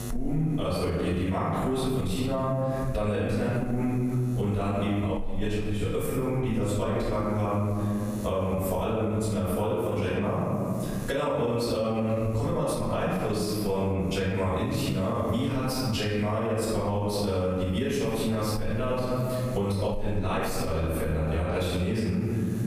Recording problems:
room echo; strong; dies away in 1.5 s
off-mic speech; far
squashed, flat; somewhat
electrical hum; faint; throughout; 60 Hz, 25 dB below the speech

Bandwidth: 15 kHz